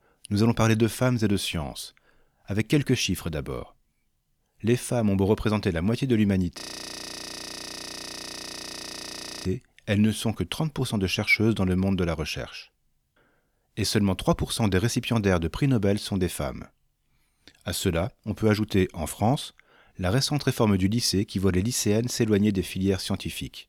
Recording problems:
audio freezing; at 6.5 s for 3 s

